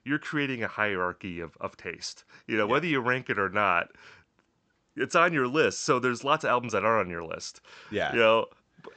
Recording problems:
high frequencies cut off; noticeable; nothing above 8 kHz

